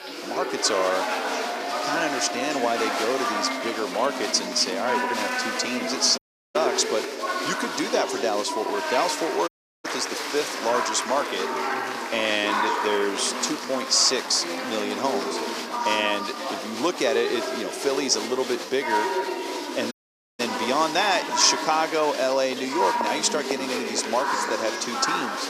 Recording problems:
thin; very; fading below 300 Hz
chatter from many people; loud; throughout; 3 dB below the speech
hiss; faint; throughout; 30 dB below the speech
audio cutting out; at 6 s, at 9.5 s and at 20 s

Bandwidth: 14.5 kHz